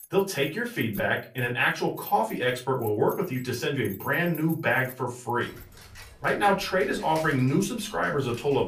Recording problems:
off-mic speech; far
room echo; very slight; dies away in 0.3 s
household noises; noticeable; throughout; 20 dB below the speech

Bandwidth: 14.5 kHz